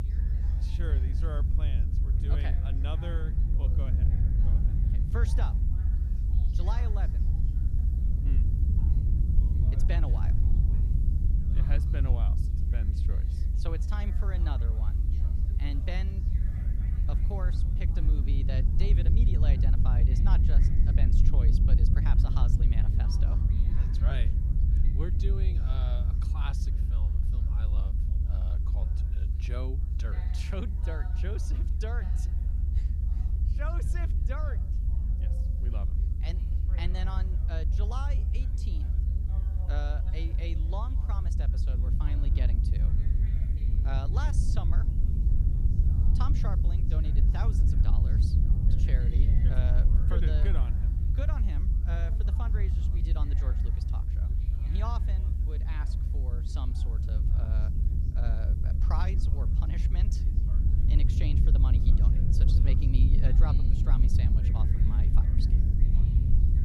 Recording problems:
low rumble; loud; throughout; 1 dB below the speech
background chatter; noticeable; throughout; 4 voices, 15 dB below the speech
hiss; faint; throughout; 25 dB below the speech

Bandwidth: 14.5 kHz